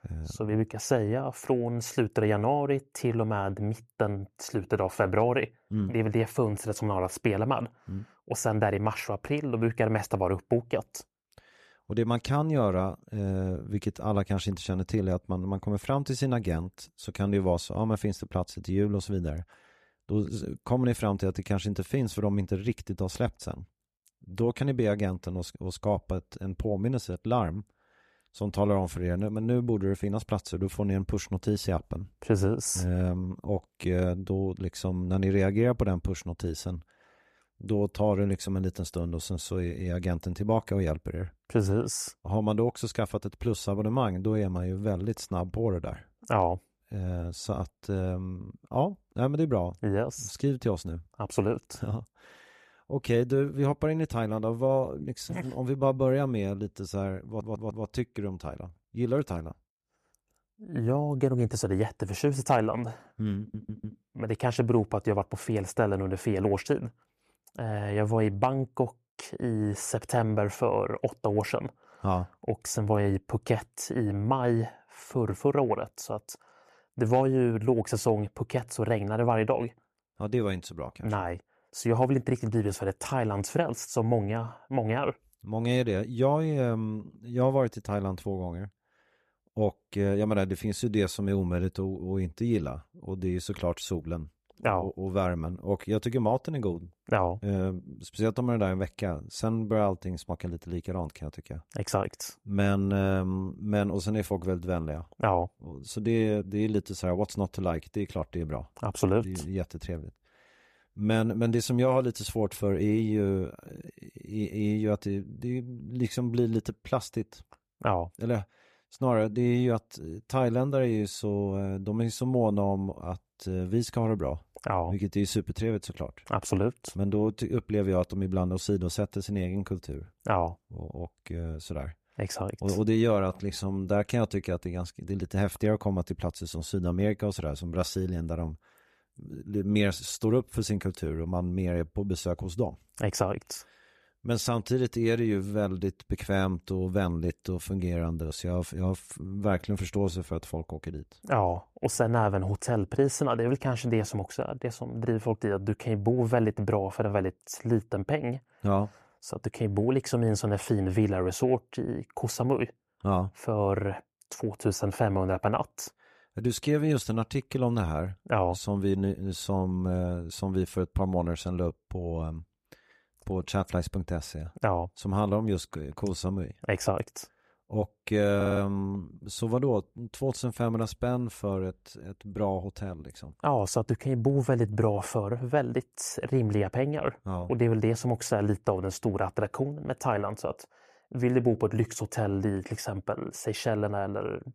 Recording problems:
audio stuttering; at 57 s, at 1:03 and at 2:58

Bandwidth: 14 kHz